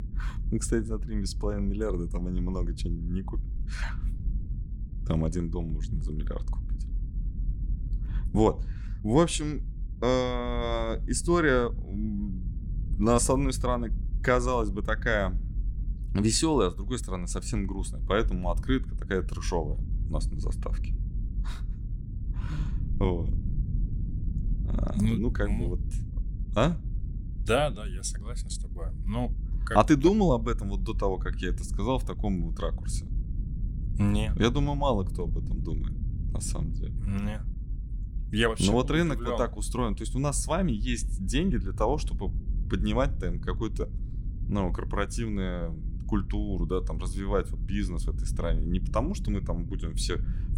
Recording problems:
low rumble; noticeable; throughout; 20 dB below the speech

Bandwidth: 16.5 kHz